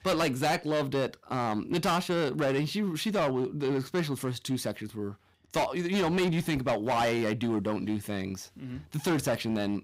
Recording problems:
distortion; heavy; 13% of the sound clipped

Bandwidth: 15.5 kHz